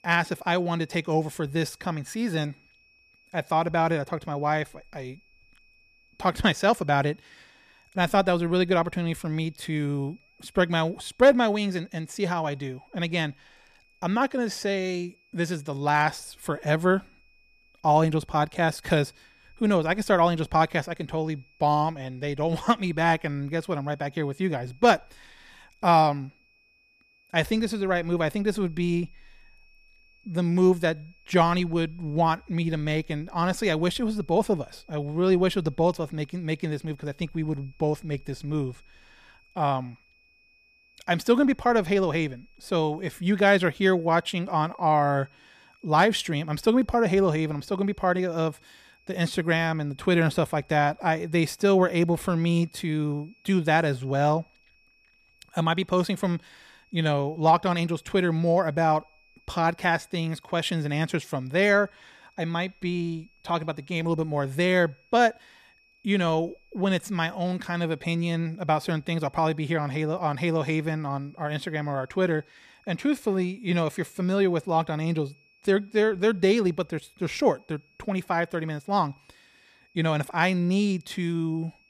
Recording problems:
high-pitched whine; faint; throughout; 2.5 kHz, 35 dB below the speech

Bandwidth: 14.5 kHz